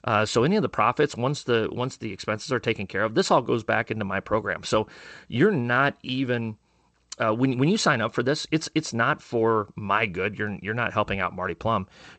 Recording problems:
garbled, watery; slightly; nothing above 8 kHz

